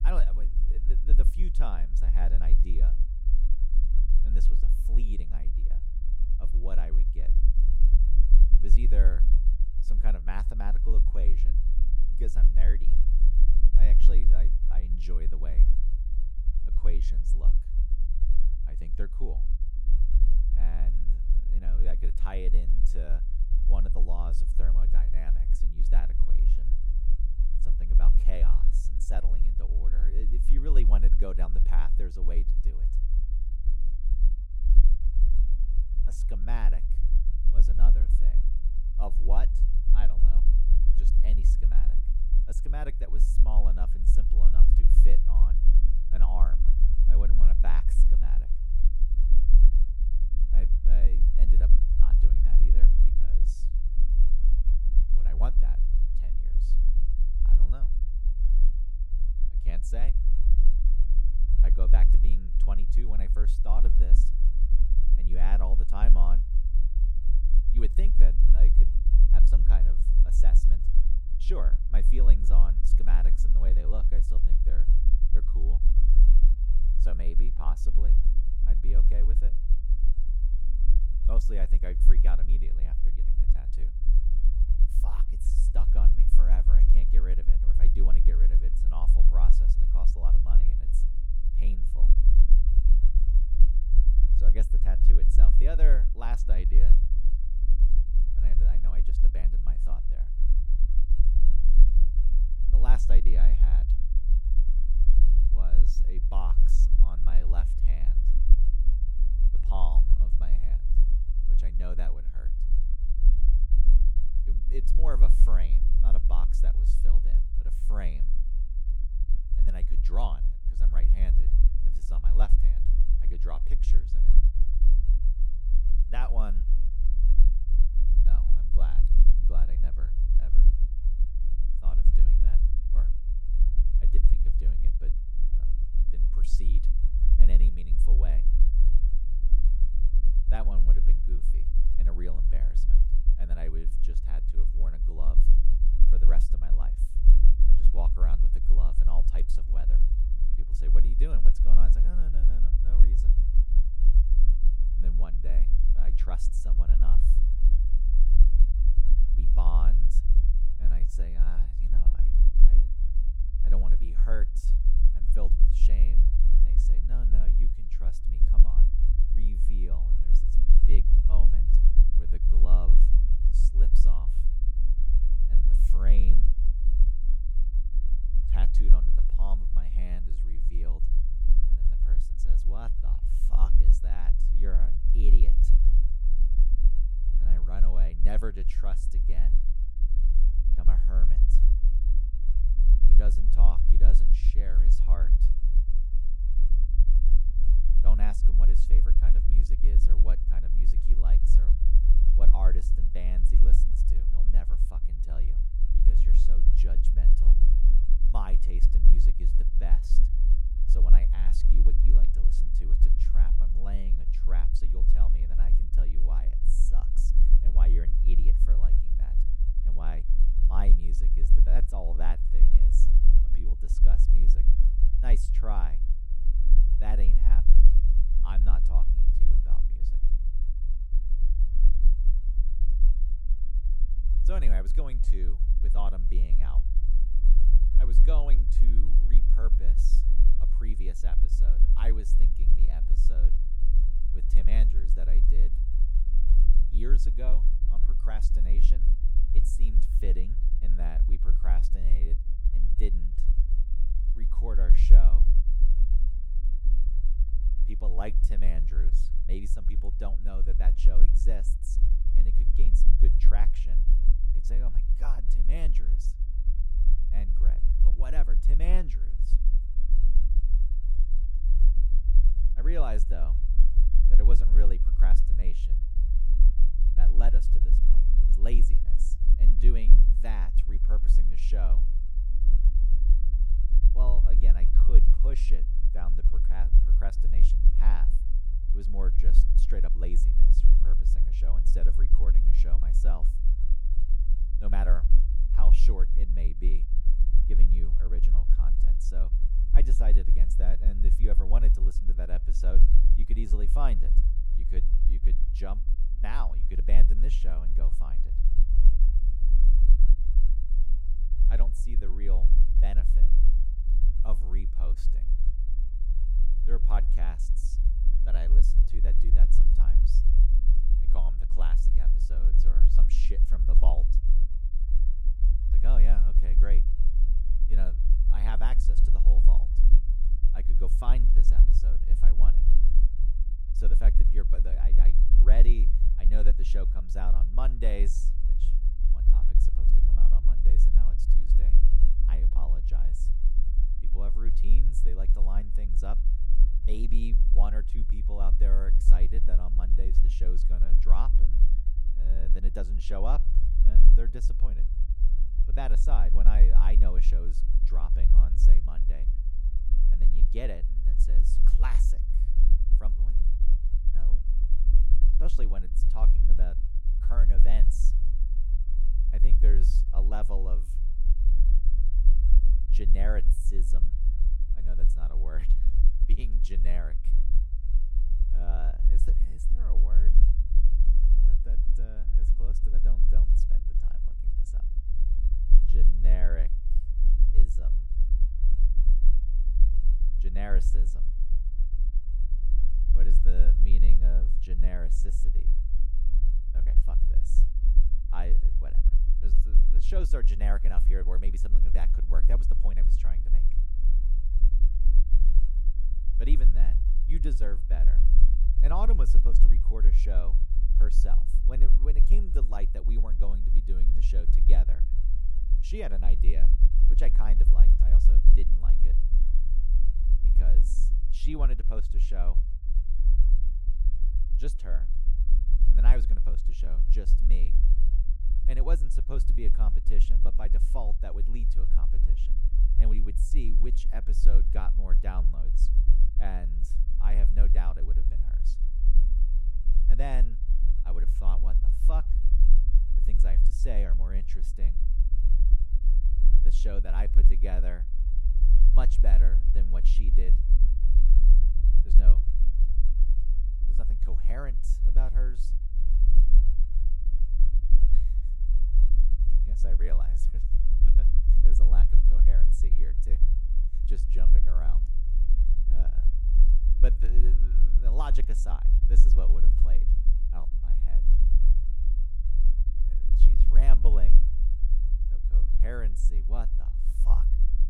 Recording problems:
low rumble; loud; throughout; 7 dB below the speech

